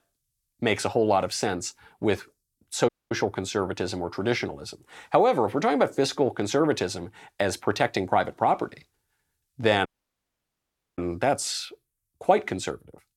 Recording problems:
audio cutting out; at 3 s and at 10 s for 1 s

